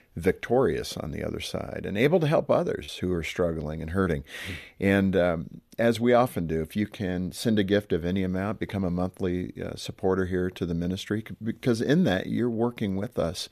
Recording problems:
choppy; occasionally; under 1% of the speech affected

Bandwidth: 14.5 kHz